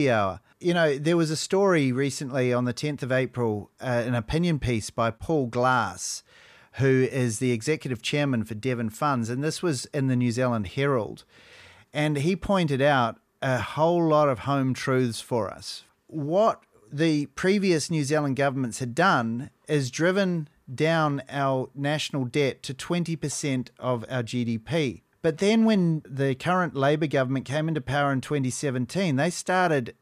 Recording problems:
abrupt cut into speech; at the start

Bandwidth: 14.5 kHz